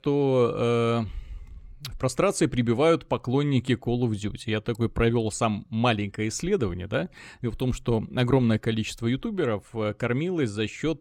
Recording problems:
none

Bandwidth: 17.5 kHz